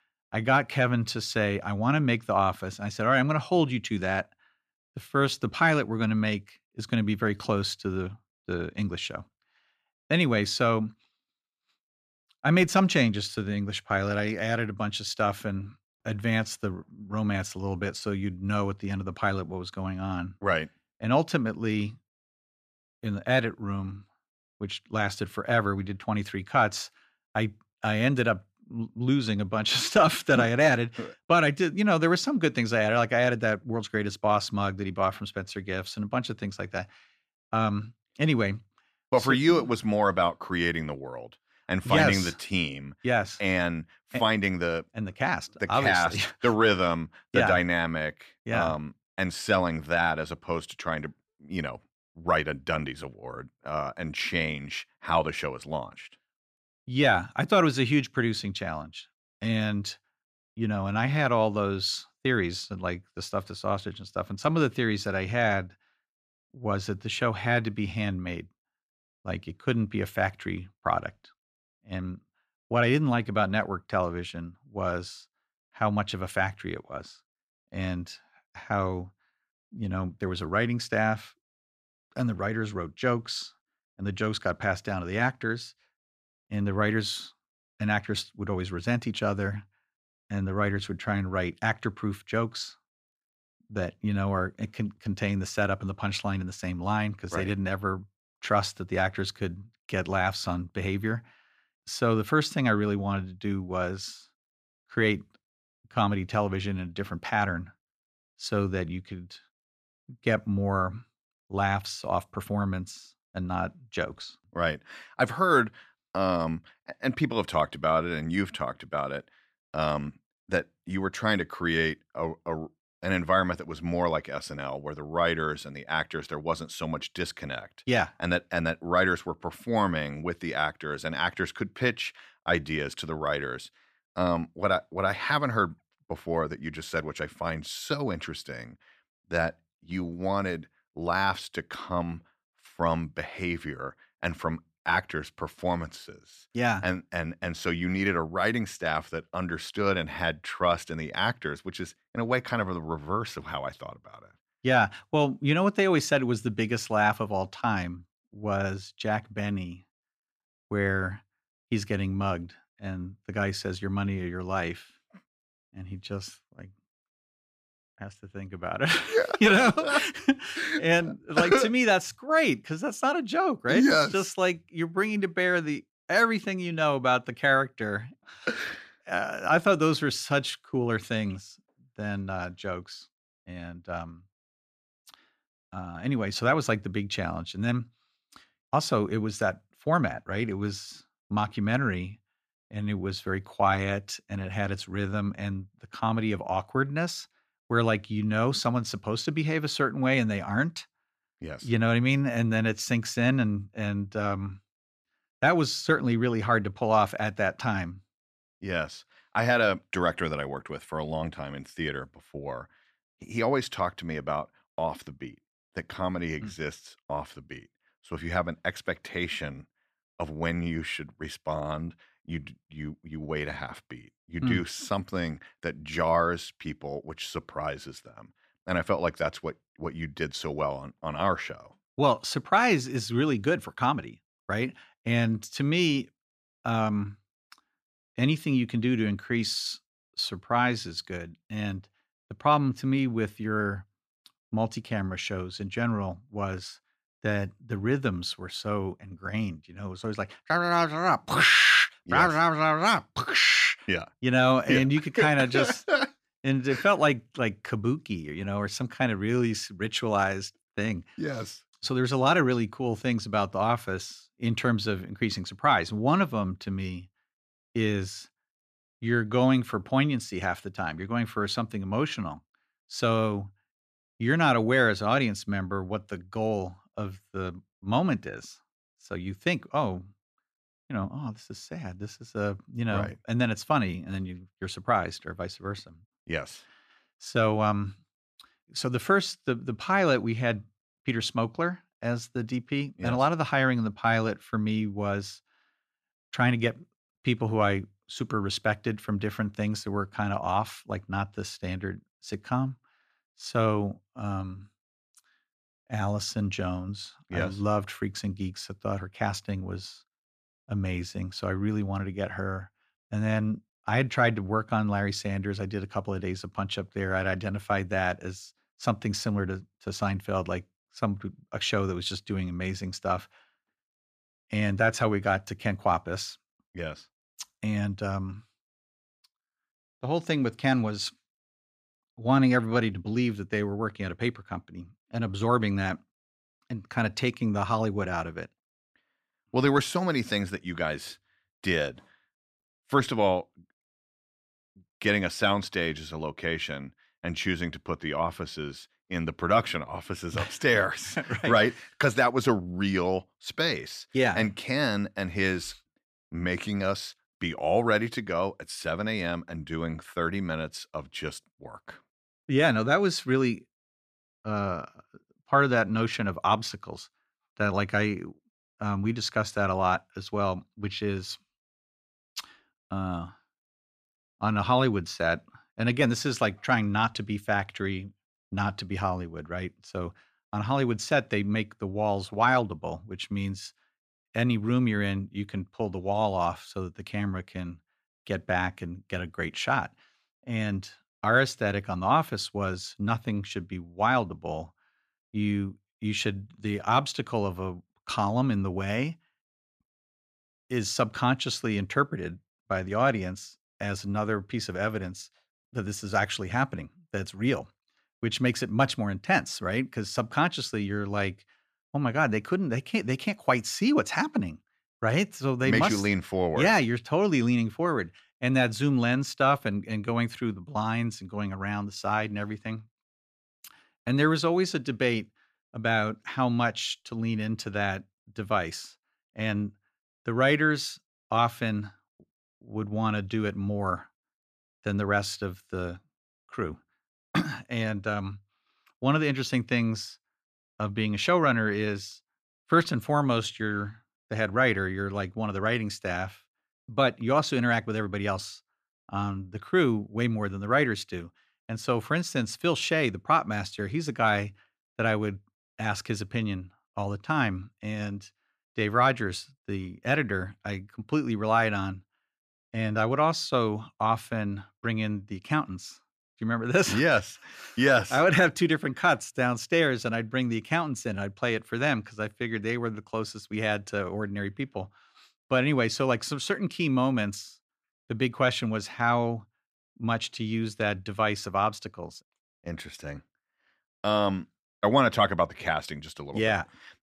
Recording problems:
none

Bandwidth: 14.5 kHz